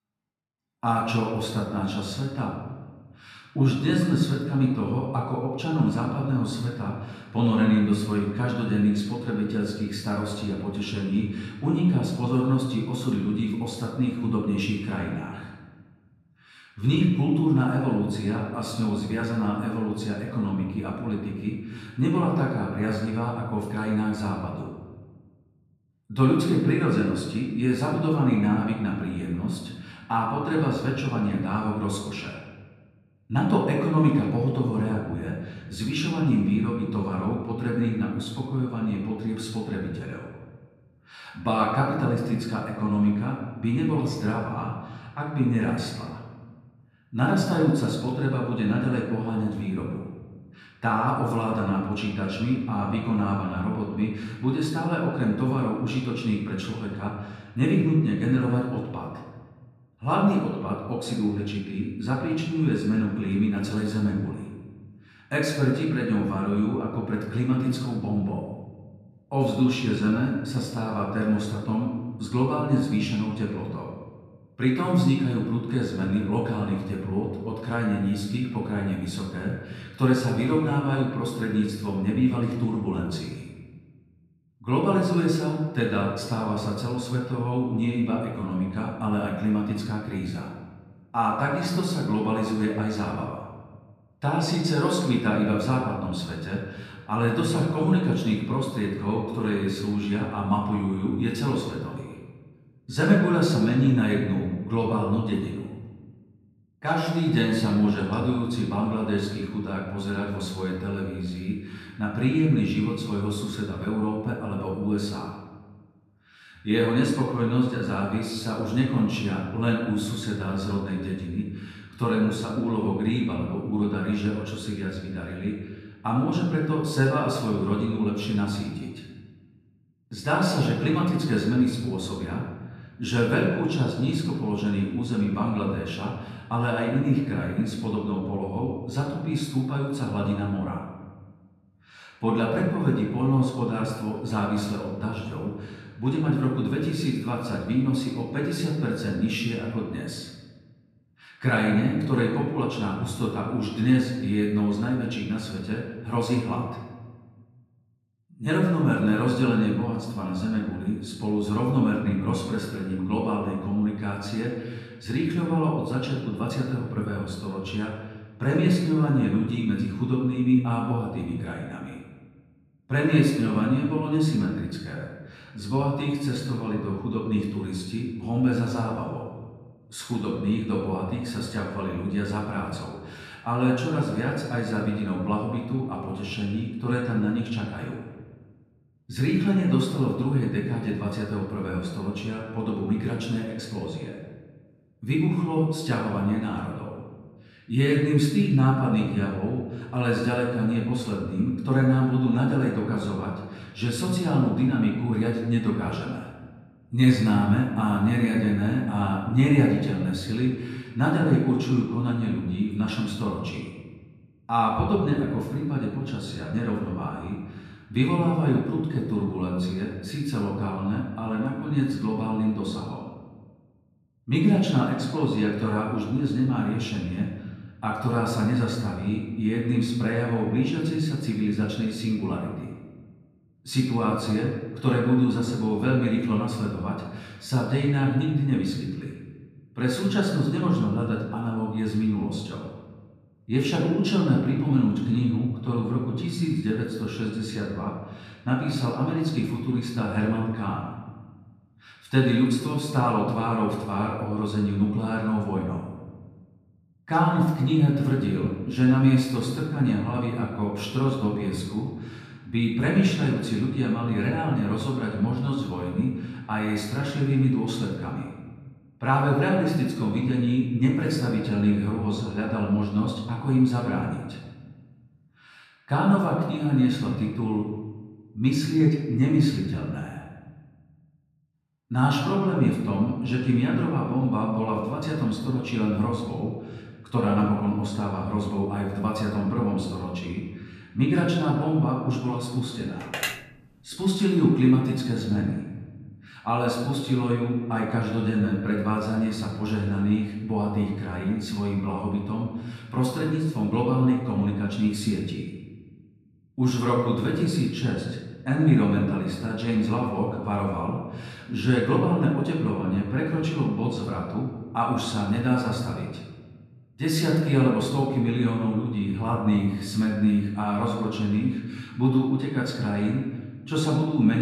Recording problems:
off-mic speech; far
room echo; noticeable; dies away in 1.2 s
phone ringing; noticeable; at 4:53; peak 3 dB below the speech
abrupt cut into speech; at the end

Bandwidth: 14.5 kHz